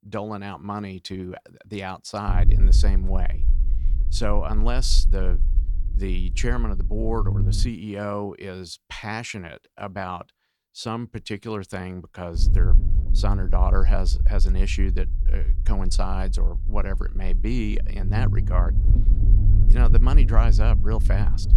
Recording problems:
low rumble; noticeable; from 2.5 to 7.5 s and from 12 s on; 10 dB below the speech

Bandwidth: 18 kHz